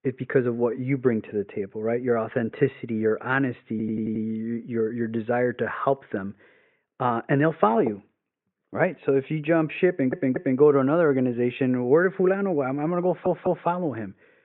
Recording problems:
high frequencies cut off; severe; nothing above 4 kHz
muffled; very slightly; fading above 2.5 kHz
audio stuttering; at 3.5 s, at 10 s and at 13 s

